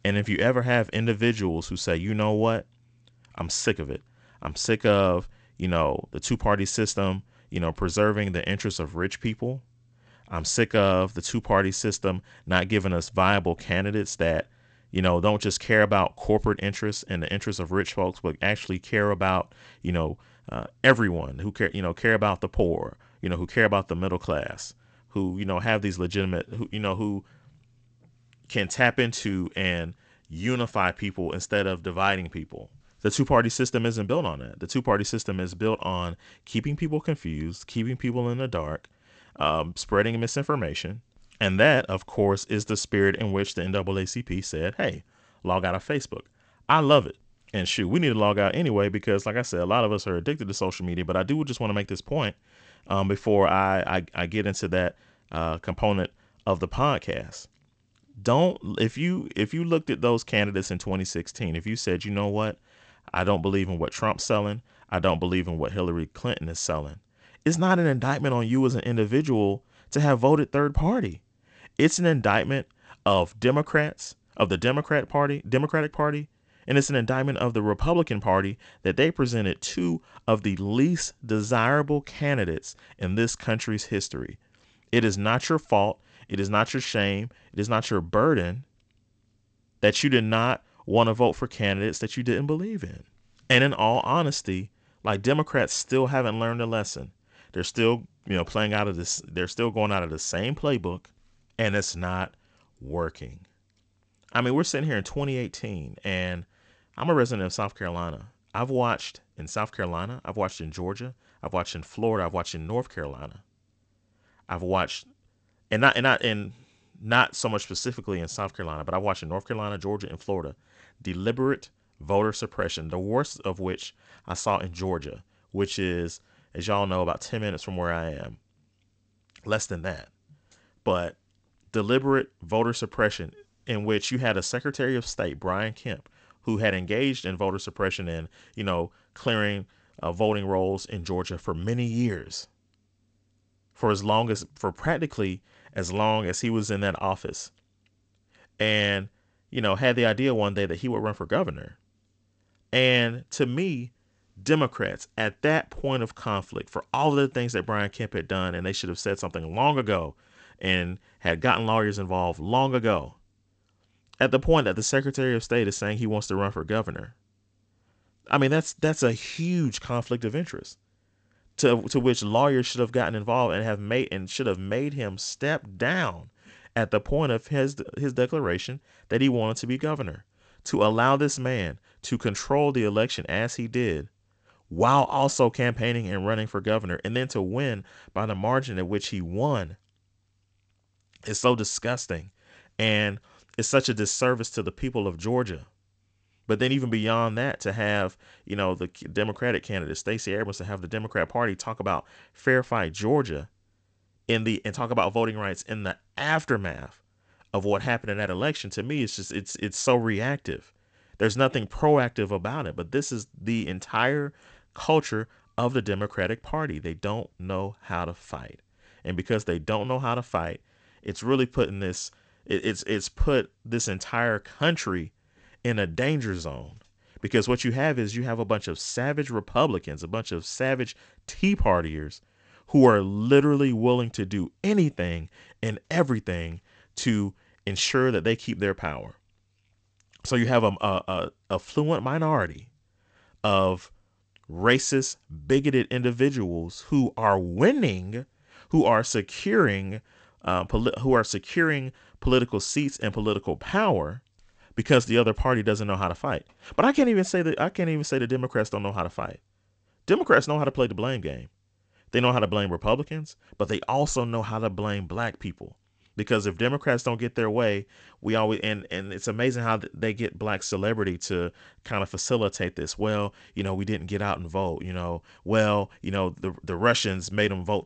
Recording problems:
garbled, watery; slightly; nothing above 8 kHz

